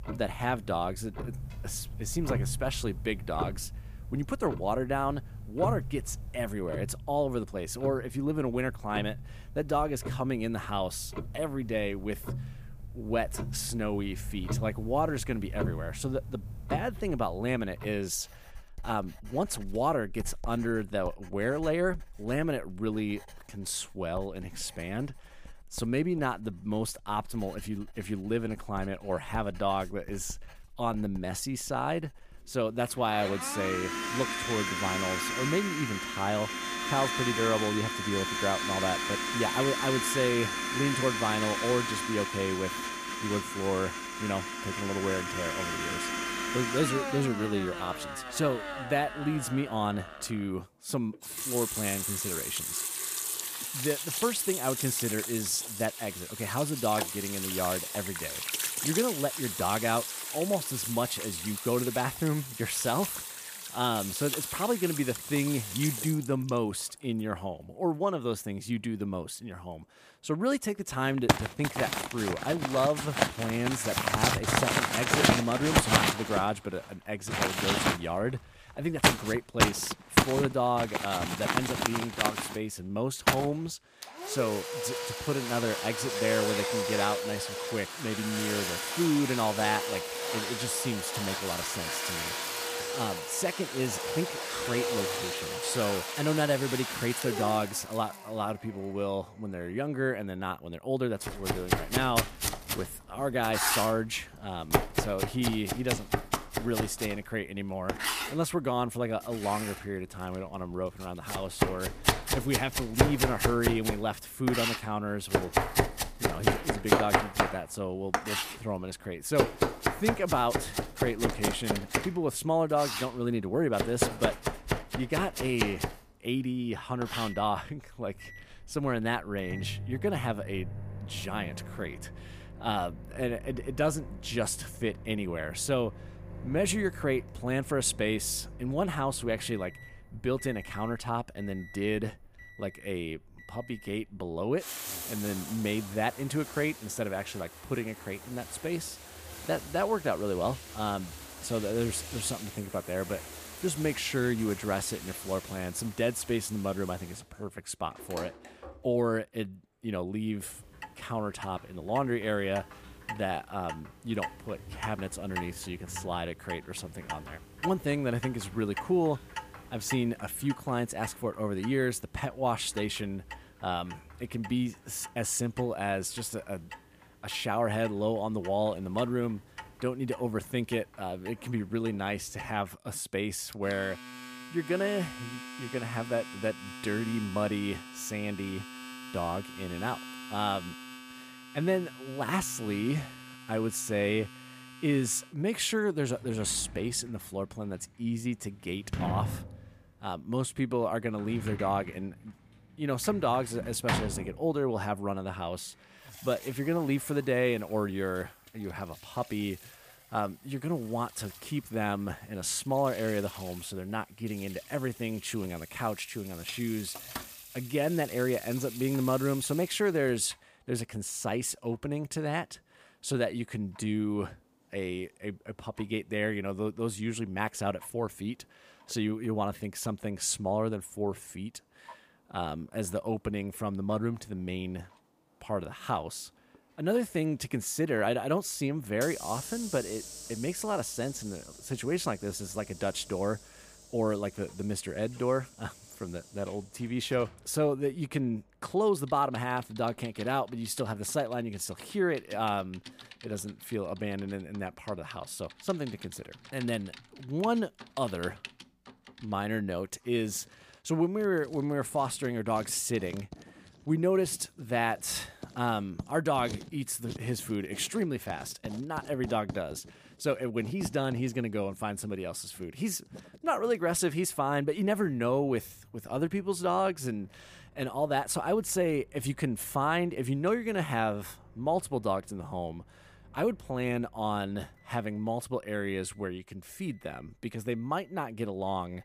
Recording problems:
household noises; loud; throughout; 2 dB below the speech

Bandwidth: 15 kHz